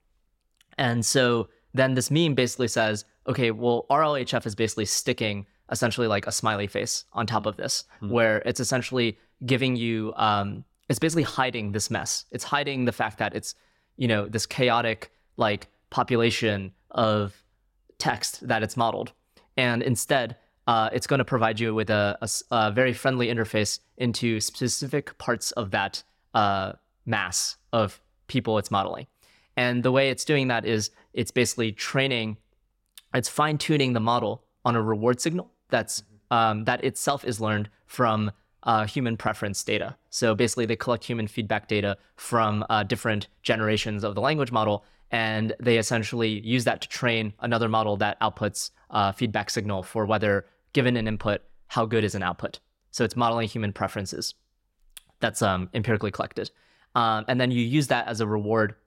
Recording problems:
none

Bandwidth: 16.5 kHz